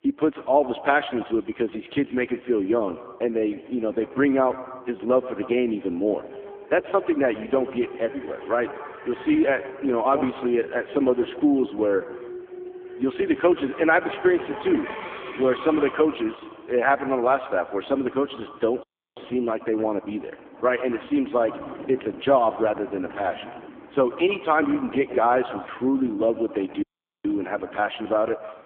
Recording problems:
phone-call audio; poor line; nothing above 3.5 kHz
echo of what is said; noticeable; throughout; 130 ms later, 15 dB below the speech
traffic noise; noticeable; throughout; 15 dB below the speech
audio cutting out; at 19 s and at 27 s

